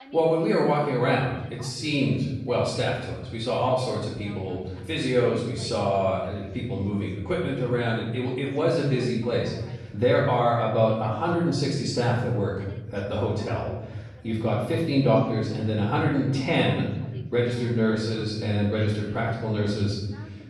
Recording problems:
off-mic speech; far
room echo; noticeable; dies away in 1.4 s
voice in the background; faint; throughout; 25 dB below the speech

